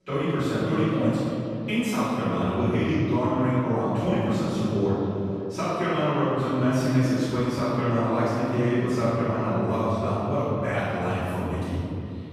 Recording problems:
room echo; strong; dies away in 2.8 s
off-mic speech; far
echo of what is said; faint; throughout; 490 ms later, 20 dB below the speech

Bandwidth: 14.5 kHz